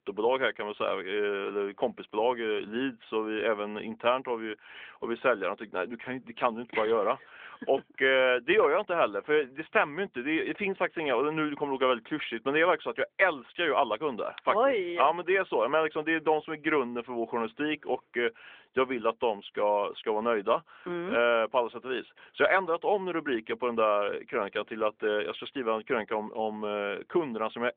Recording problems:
phone-call audio; nothing above 3.5 kHz

